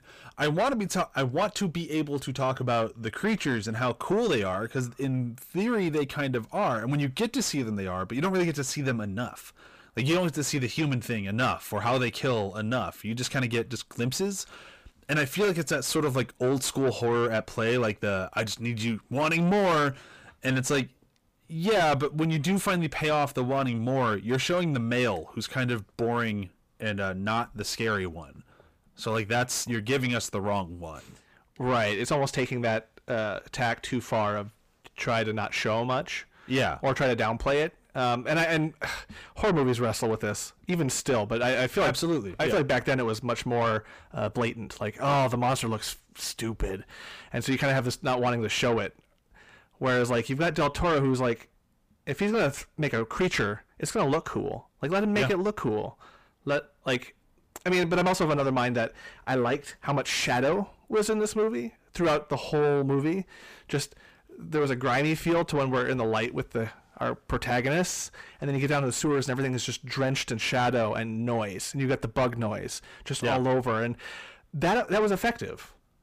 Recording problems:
distortion; heavy; 6 dB below the speech

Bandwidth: 15 kHz